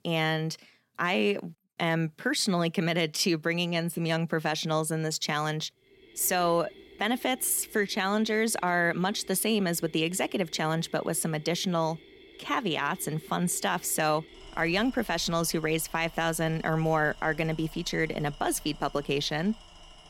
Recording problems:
machinery noise; faint; from 6 s on; 20 dB below the speech

